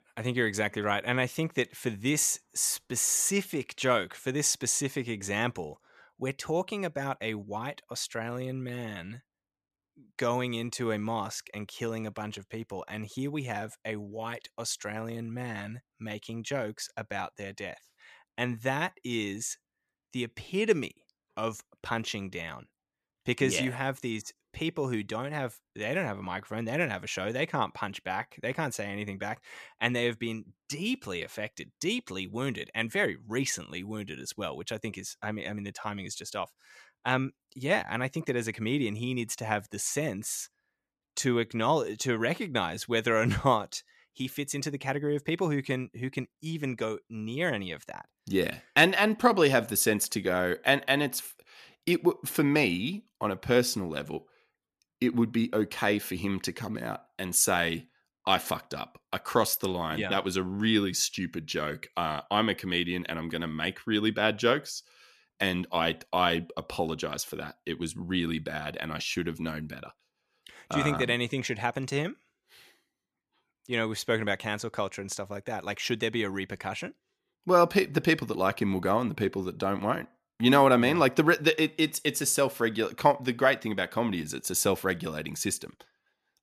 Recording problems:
none

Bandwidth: 14 kHz